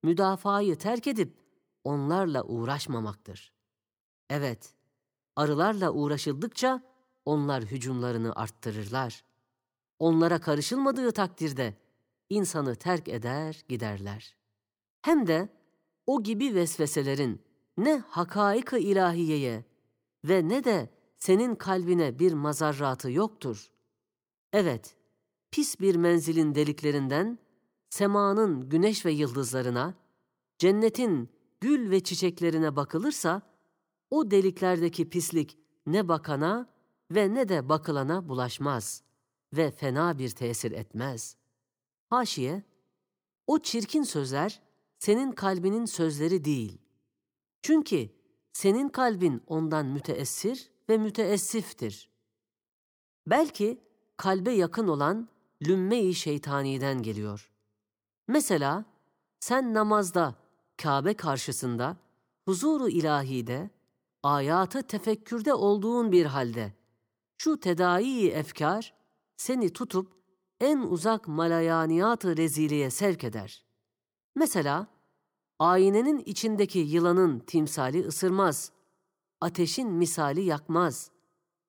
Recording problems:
none

